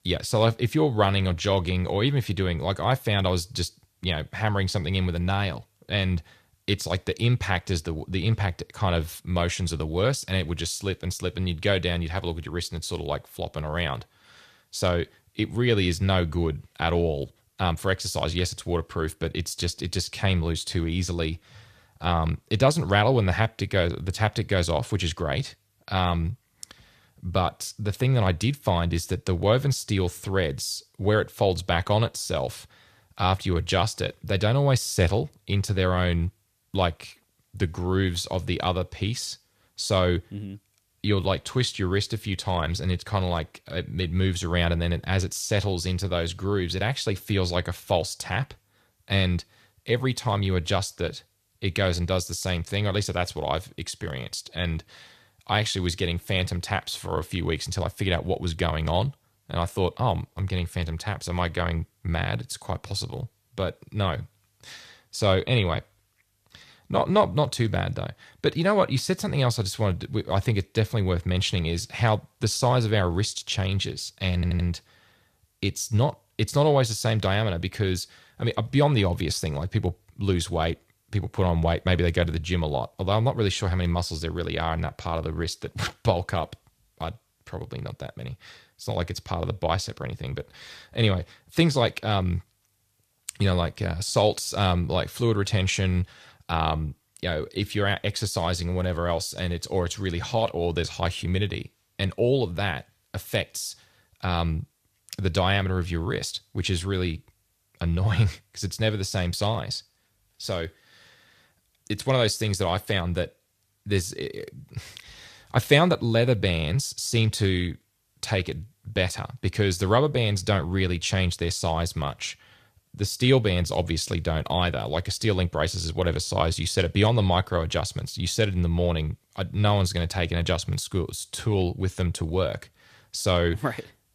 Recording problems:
audio stuttering; at 1:14

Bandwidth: 14.5 kHz